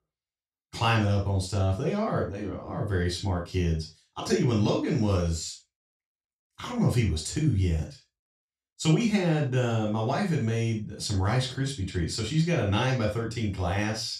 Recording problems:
off-mic speech; far
room echo; noticeable; dies away in 0.2 s

